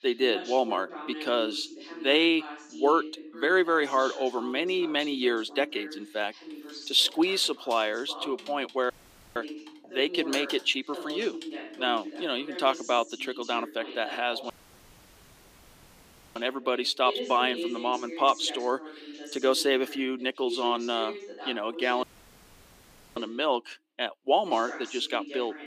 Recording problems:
thin; very slightly; fading below 250 Hz
voice in the background; noticeable; throughout; 15 dB below the speech
keyboard typing; faint; from 7 to 12 s; peak 10 dB below the speech
audio cutting out; at 9 s, at 15 s for 2 s and at 22 s for 1 s

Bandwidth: 15 kHz